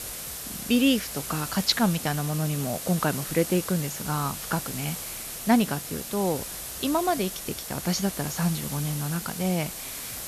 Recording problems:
high frequencies cut off; noticeable; nothing above 7.5 kHz
hiss; loud; throughout; 6 dB below the speech

